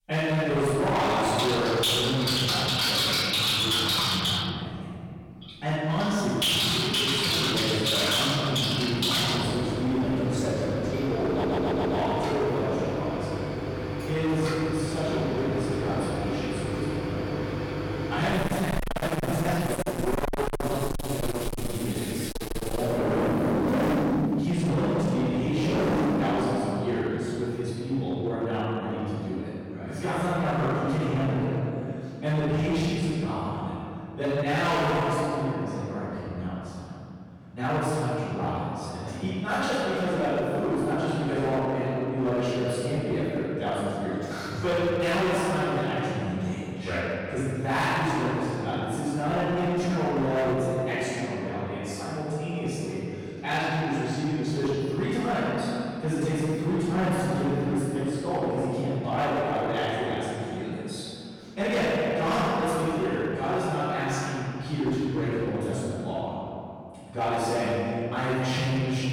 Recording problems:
distortion; heavy; 19% of the sound clipped
room echo; strong; dies away in 2.5 s
off-mic speech; far
household noises; very loud; until 26 s; 1 dB above the speech
audio stuttering; at 11 s

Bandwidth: 17 kHz